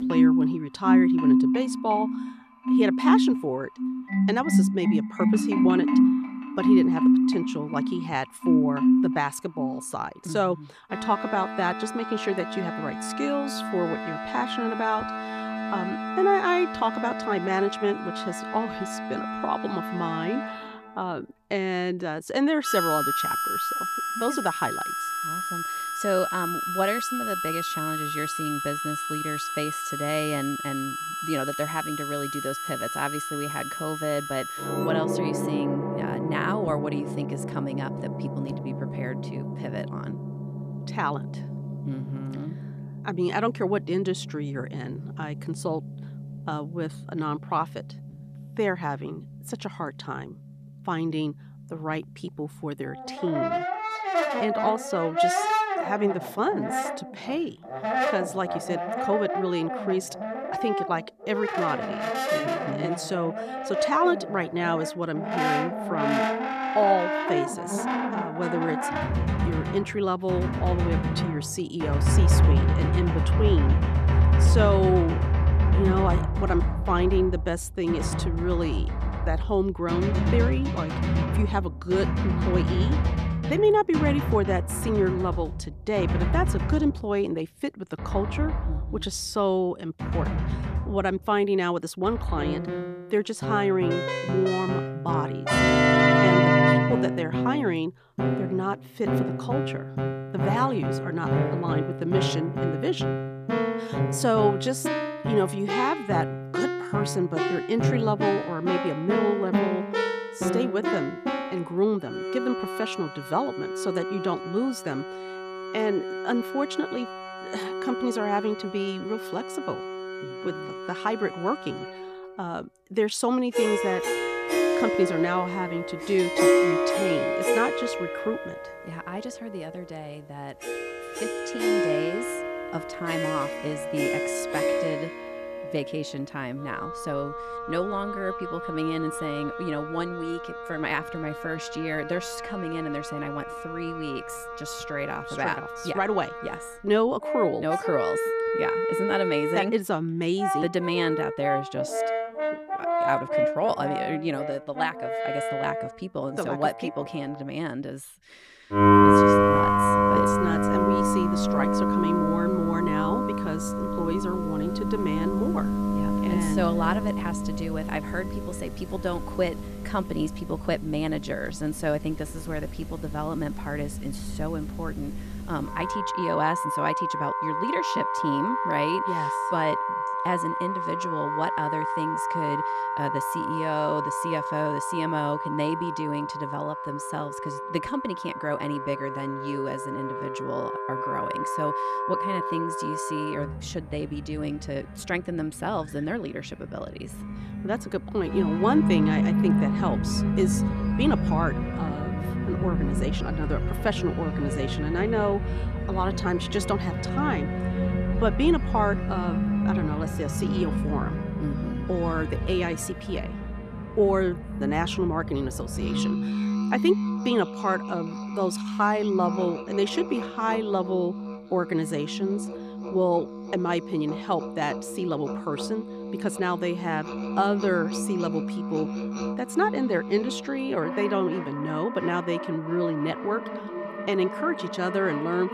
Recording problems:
background music; very loud; throughout; 1 dB above the speech

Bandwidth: 14.5 kHz